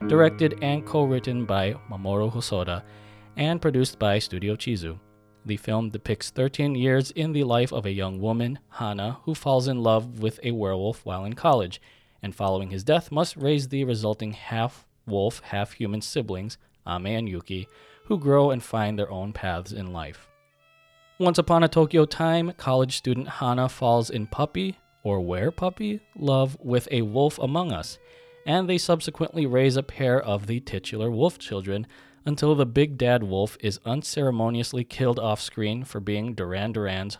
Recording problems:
background music; faint; throughout; 20 dB below the speech

